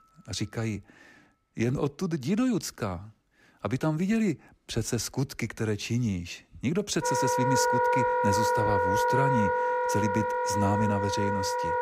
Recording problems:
background music; very loud; throughout; 4 dB above the speech

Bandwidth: 15.5 kHz